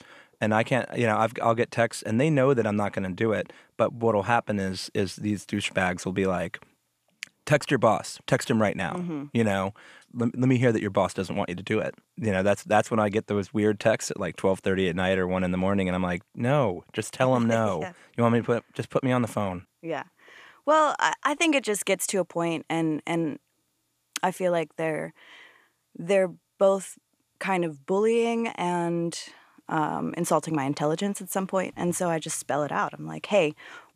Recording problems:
none

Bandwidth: 14.5 kHz